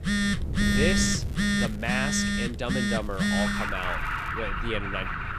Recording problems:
alarms or sirens; very loud; throughout; 4 dB above the speech
wind noise on the microphone; occasional gusts; 15 dB below the speech
crackling; faint; from 1 to 2 s and from 3 to 4.5 s; 20 dB below the speech

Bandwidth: 14.5 kHz